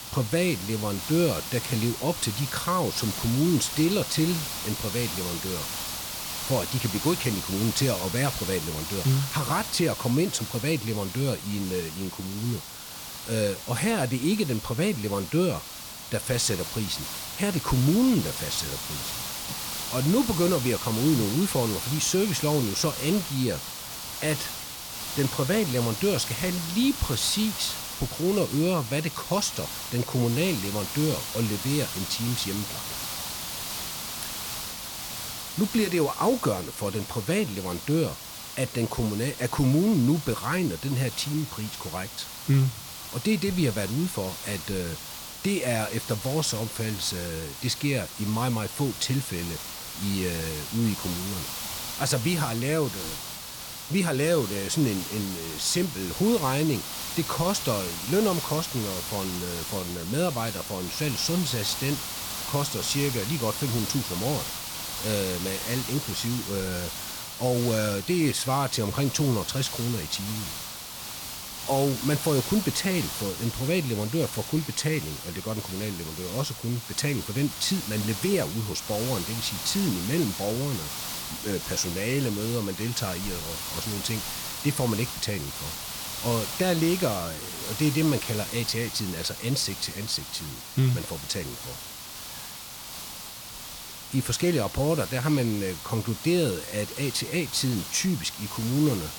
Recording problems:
hiss; loud; throughout; 6 dB below the speech

